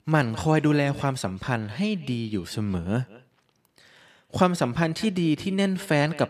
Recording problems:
echo of what is said; faint; throughout; 200 ms later, 20 dB below the speech

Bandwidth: 14.5 kHz